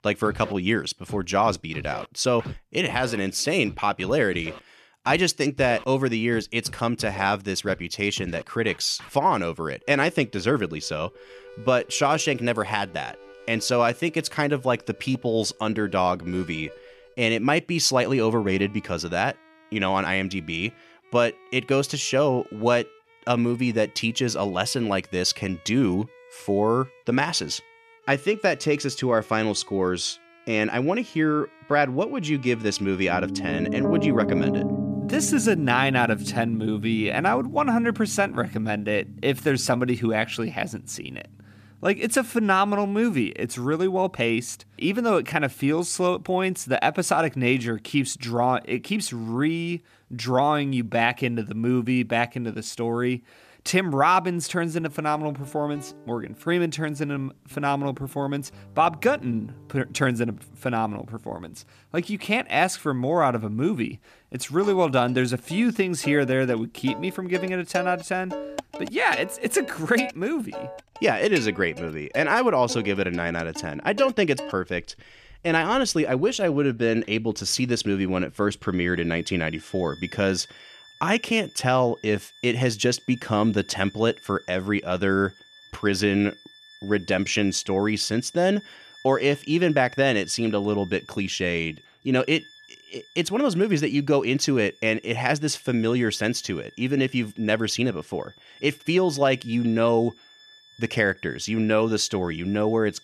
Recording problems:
background music; noticeable; throughout; 15 dB below the speech

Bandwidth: 14.5 kHz